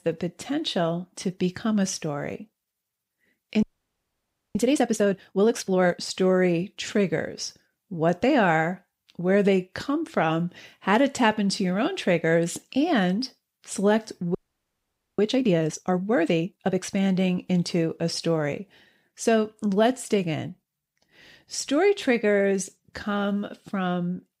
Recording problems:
audio freezing; at 3.5 s for 1 s and at 14 s for 1 s

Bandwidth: 15.5 kHz